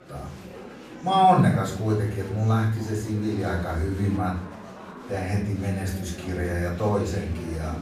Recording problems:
off-mic speech; far
room echo; noticeable; dies away in 0.5 s
murmuring crowd; noticeable; throughout; 15 dB below the speech

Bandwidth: 14.5 kHz